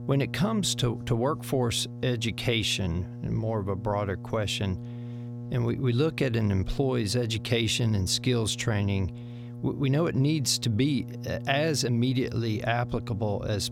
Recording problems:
electrical hum; noticeable; throughout; 60 Hz, 20 dB below the speech

